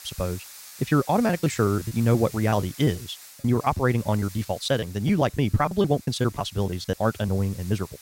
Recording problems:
wrong speed, natural pitch; too fast; 1.5 times normal speed
hiss; noticeable; throughout; 20 dB below the speech
choppy; very; 10% of the speech affected

